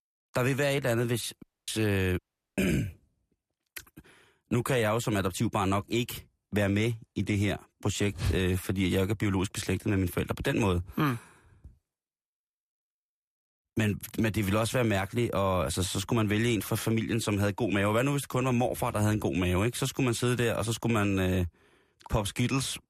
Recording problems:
audio cutting out; at 1.5 s and at 2 s

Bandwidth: 14.5 kHz